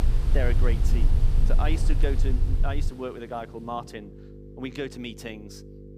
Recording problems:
rain or running water; loud; throughout; 8 dB below the speech
electrical hum; noticeable; throughout; 50 Hz, 15 dB below the speech
low rumble; noticeable; until 3 s; 10 dB below the speech

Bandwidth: 15 kHz